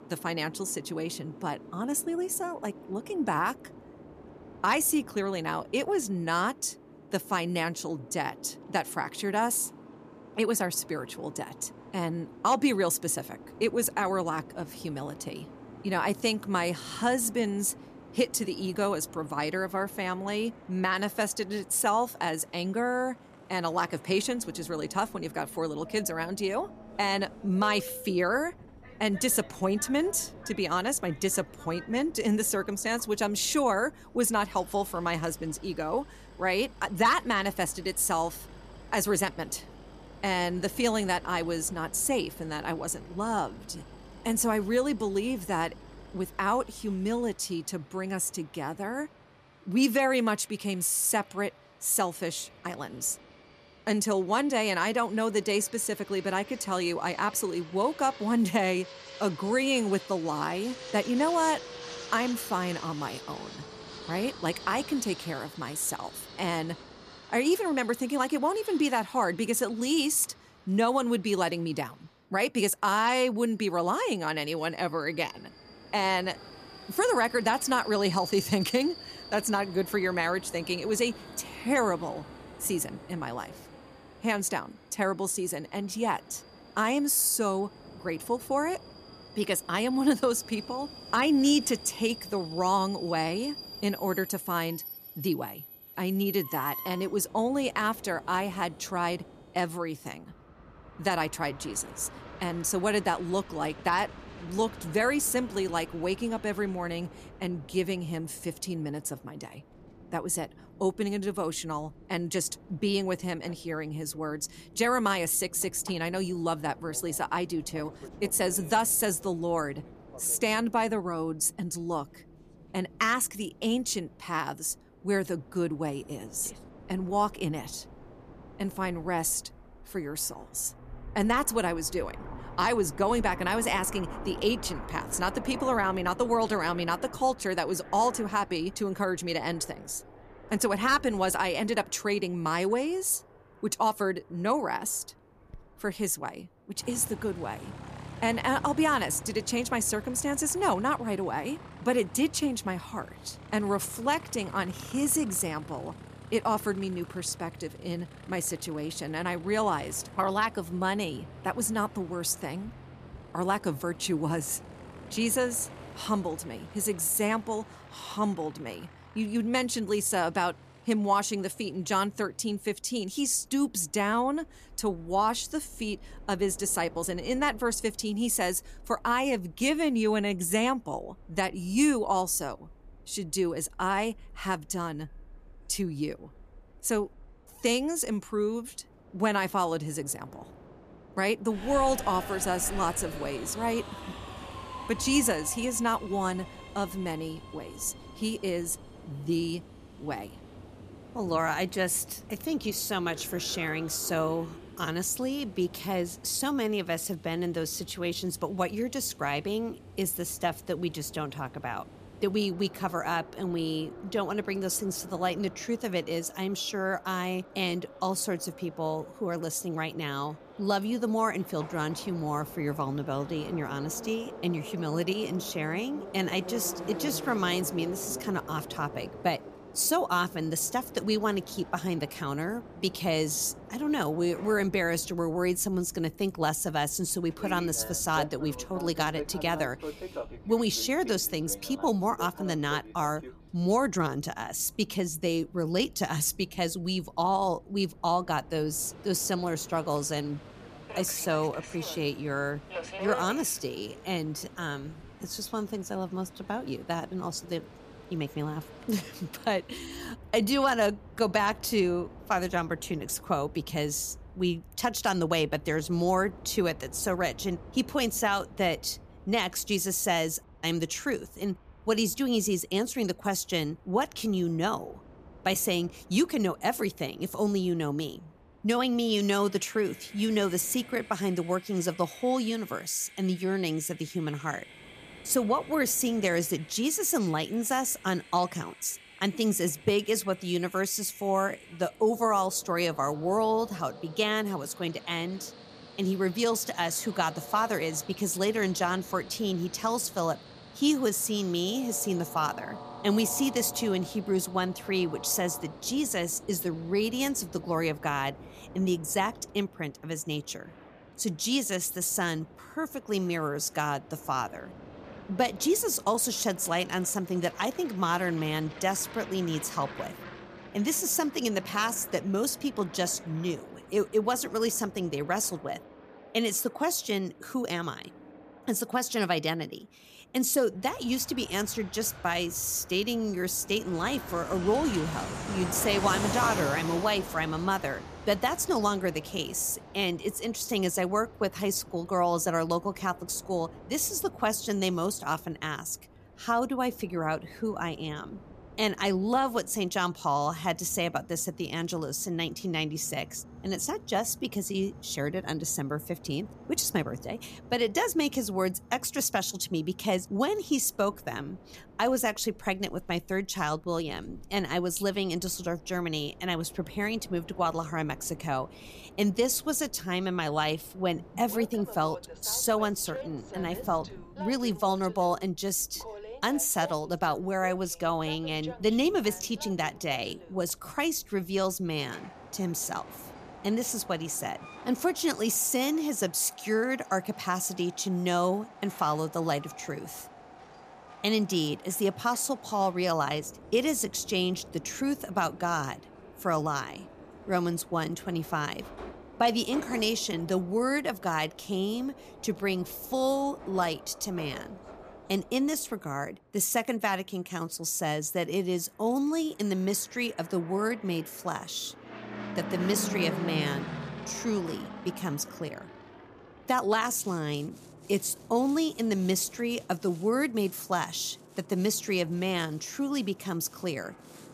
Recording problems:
train or aircraft noise; noticeable; throughout; 15 dB below the speech

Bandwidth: 14.5 kHz